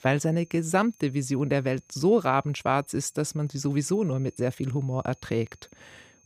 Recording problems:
high-pitched whine; faint; throughout; 6.5 kHz, 30 dB below the speech

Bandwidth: 15 kHz